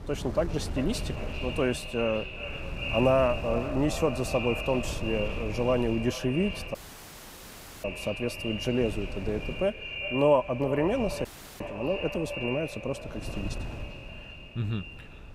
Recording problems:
echo of what is said; strong; throughout; 390 ms later, 8 dB below the speech
wind noise on the microphone; occasional gusts; 15 dB below the speech
audio cutting out; at 7 s for 1 s and at 11 s

